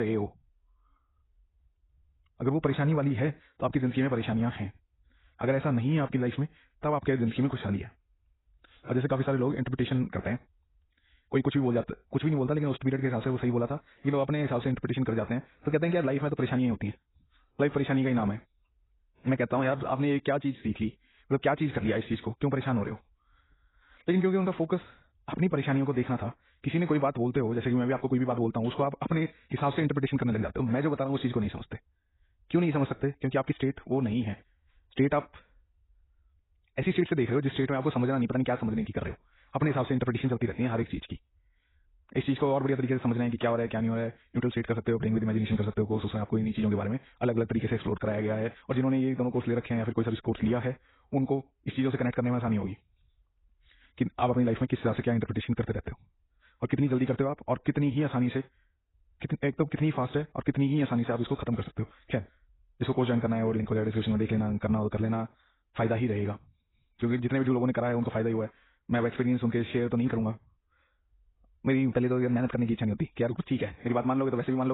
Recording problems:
garbled, watery; badly; nothing above 4 kHz
wrong speed, natural pitch; too fast; 1.5 times normal speed
abrupt cut into speech; at the start and the end

